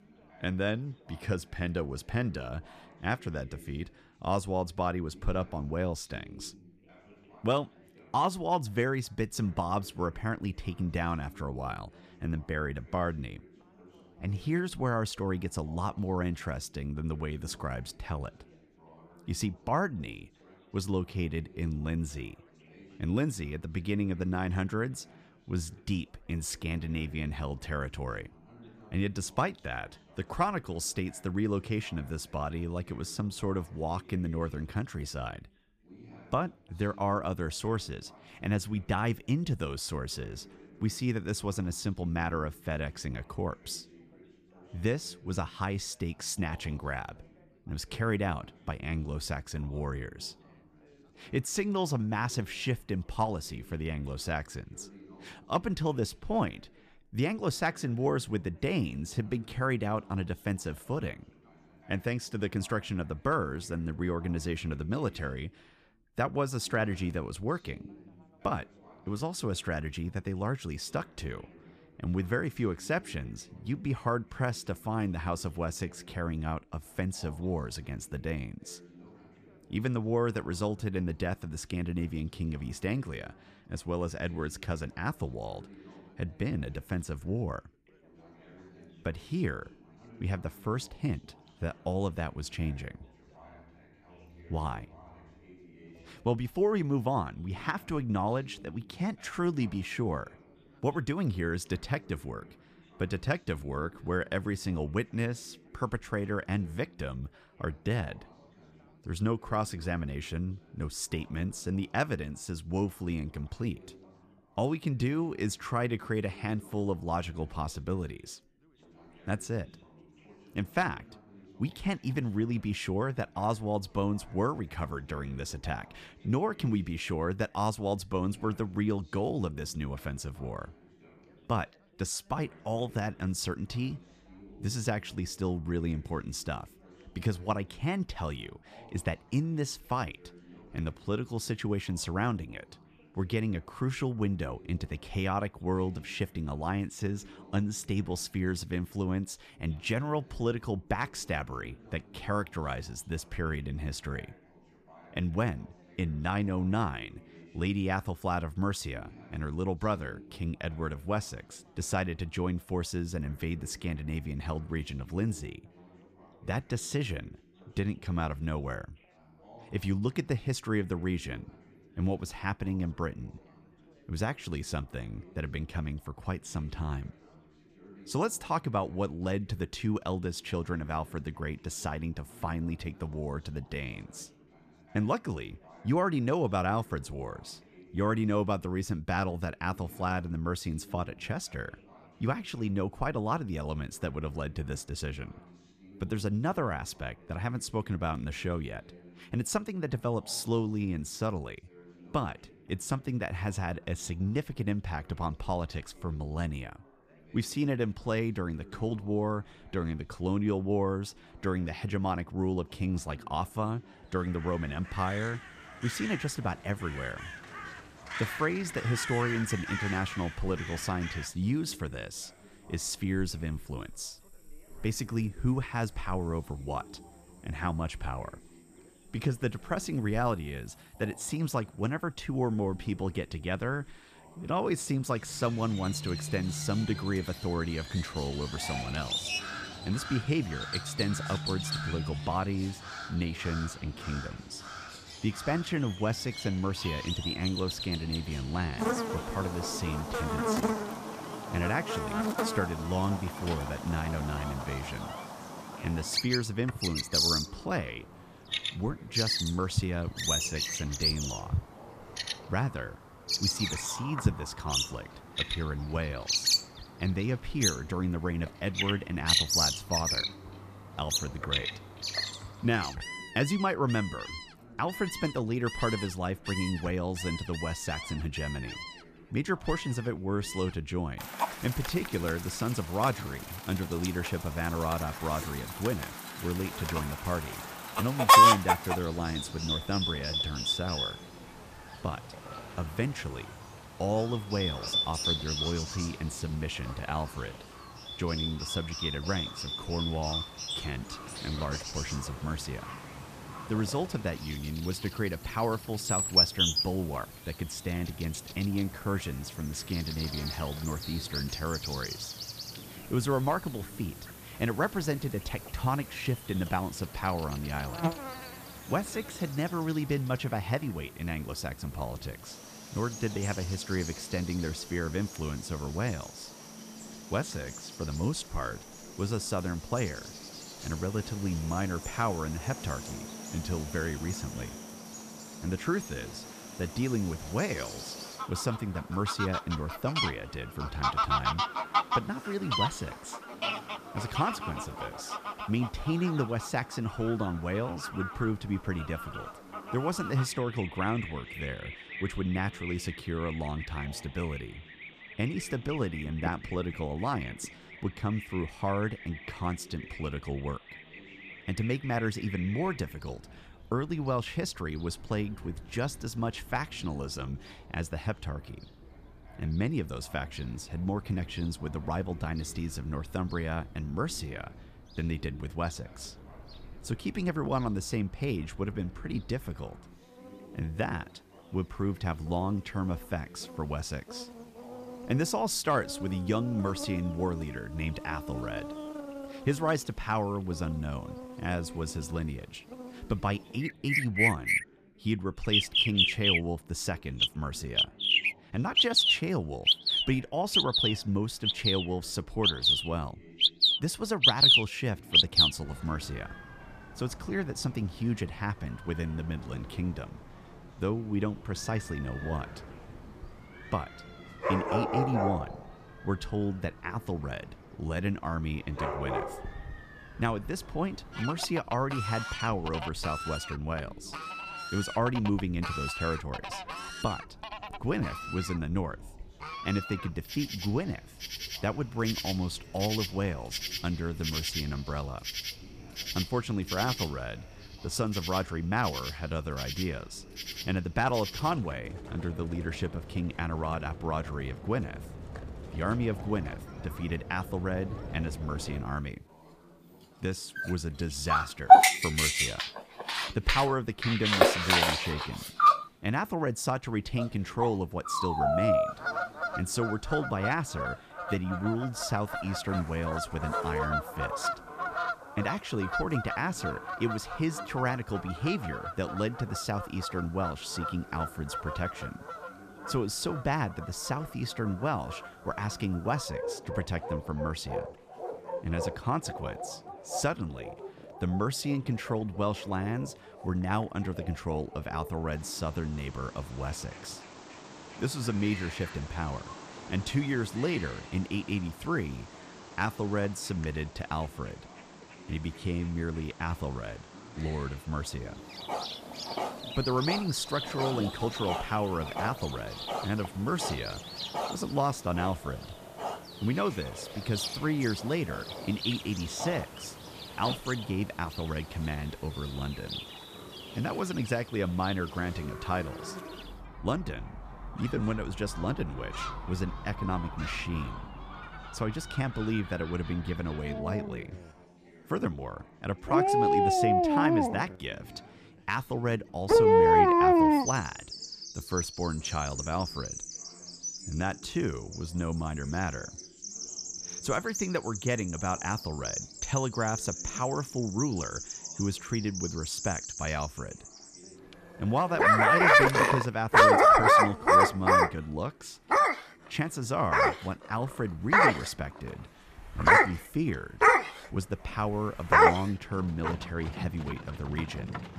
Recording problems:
animal sounds; very loud; from 3:34 on; 3 dB above the speech
background chatter; faint; throughout; 3 voices, 25 dB below the speech

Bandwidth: 14.5 kHz